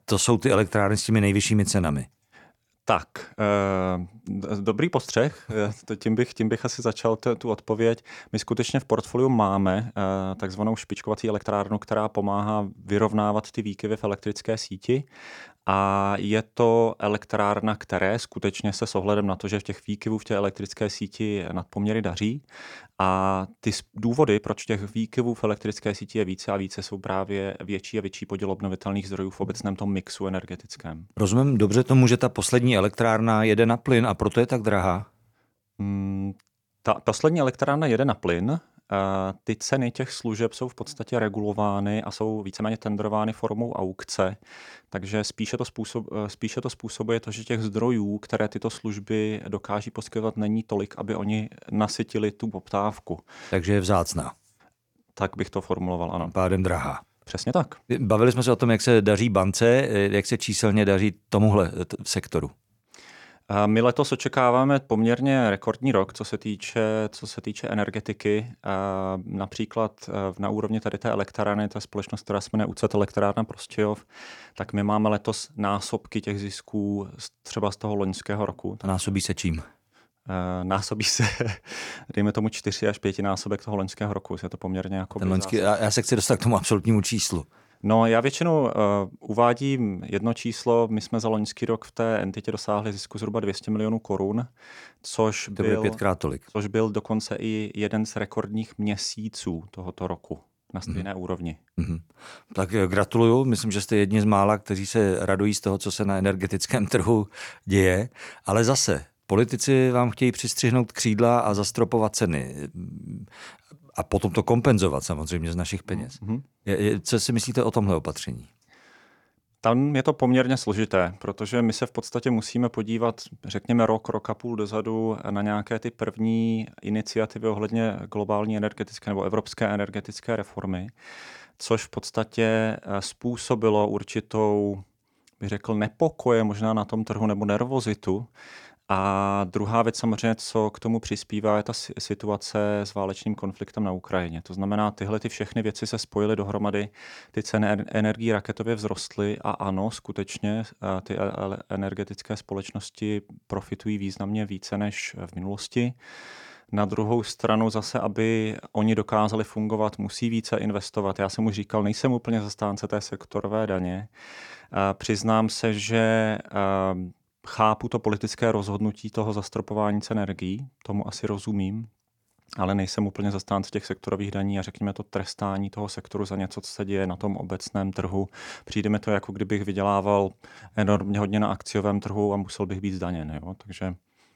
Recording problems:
uneven, jittery; strongly; from 11 s to 3:01

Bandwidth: 18.5 kHz